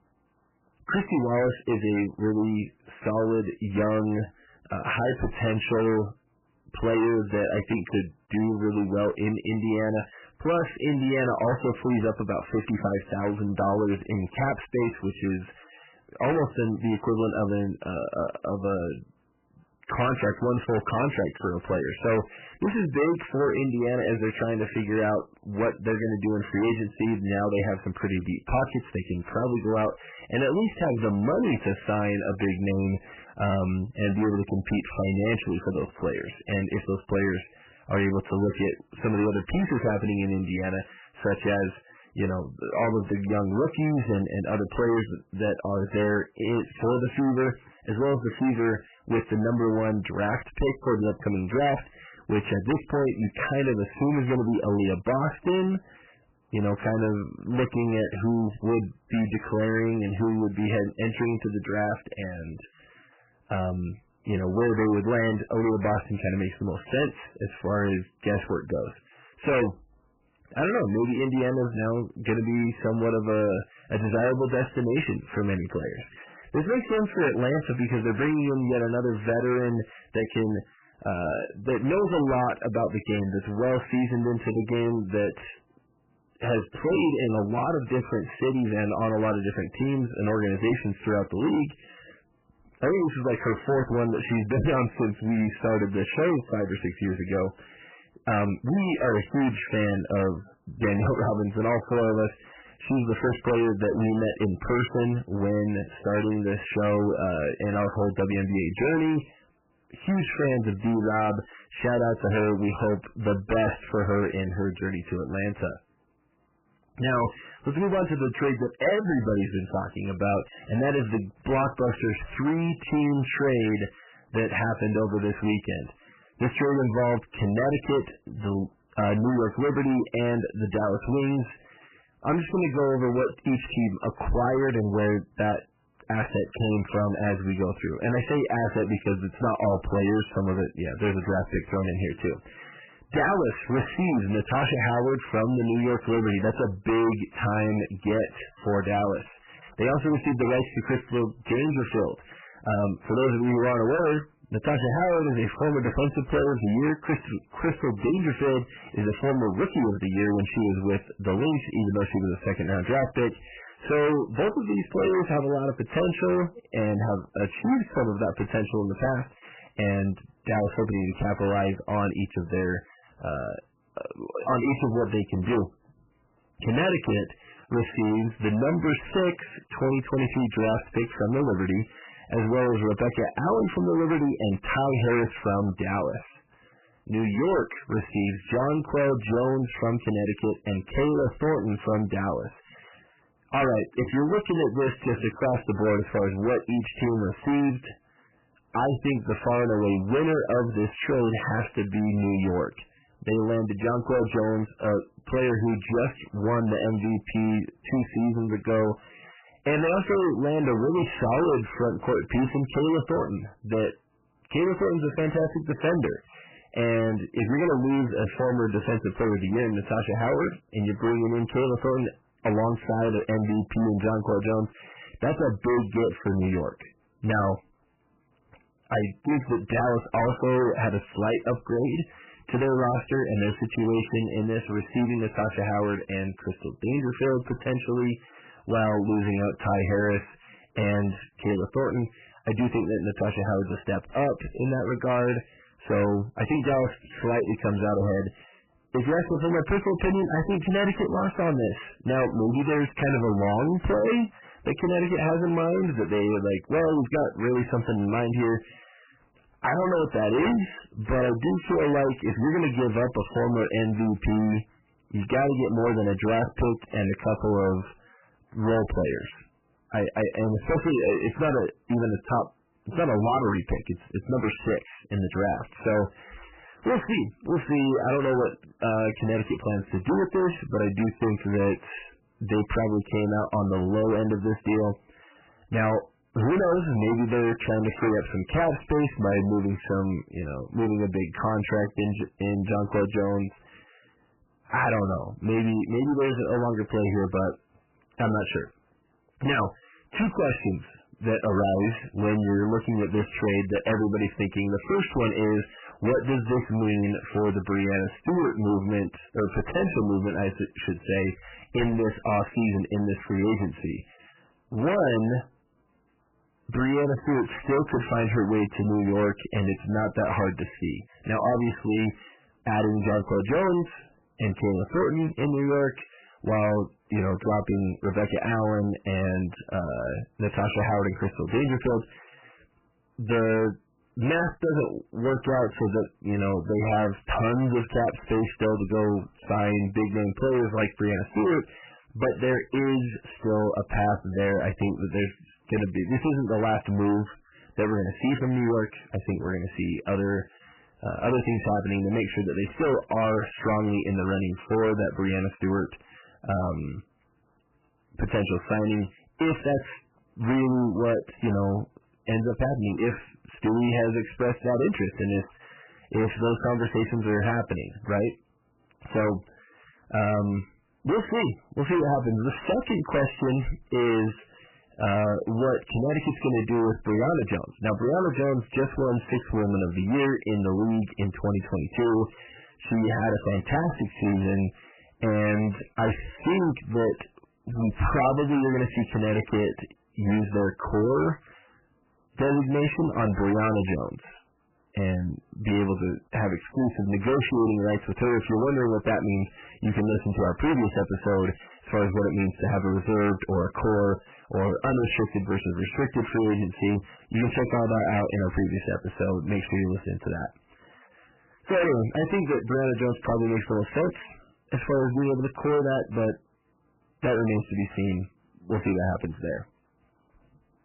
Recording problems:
distortion; heavy; 18% of the sound clipped
garbled, watery; badly; nothing above 3 kHz

